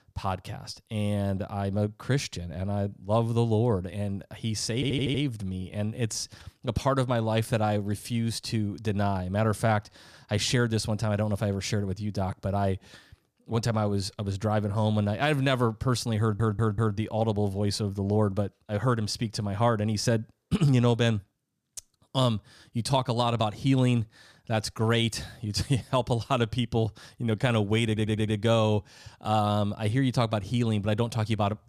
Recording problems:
audio stuttering; at 5 s, at 16 s and at 28 s

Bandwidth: 15 kHz